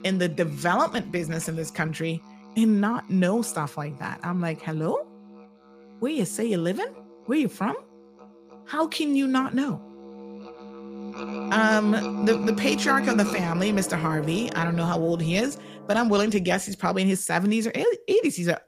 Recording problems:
background music; loud; throughout; 10 dB below the speech

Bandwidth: 15 kHz